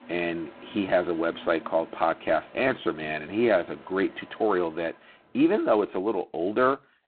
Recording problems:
phone-call audio; poor line; nothing above 4 kHz
traffic noise; faint; until 5 s; 20 dB below the speech

